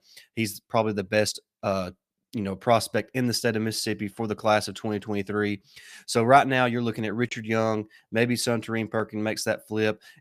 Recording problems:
none

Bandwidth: 15 kHz